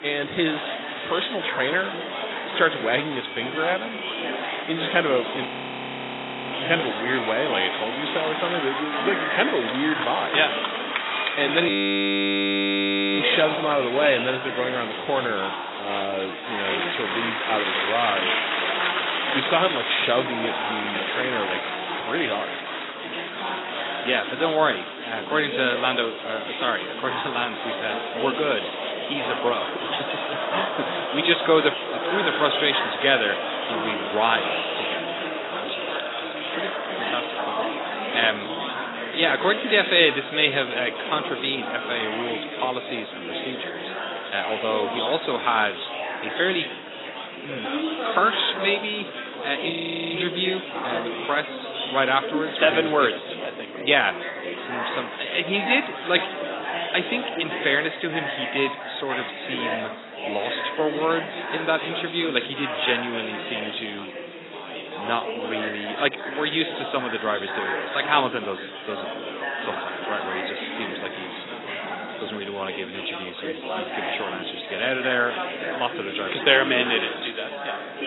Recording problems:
garbled, watery; badly; nothing above 4 kHz
thin; somewhat; fading below 350 Hz
chatter from many people; loud; throughout; 4 dB below the speech
audio freezing; at 5.5 s for 1 s, at 12 s for 1.5 s and at 50 s

